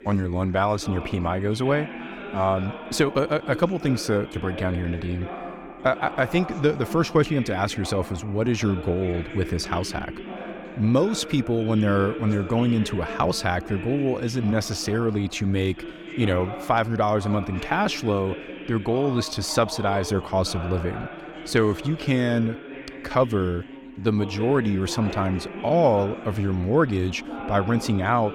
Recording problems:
background chatter; noticeable; throughout; 3 voices, 10 dB below the speech

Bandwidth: 18 kHz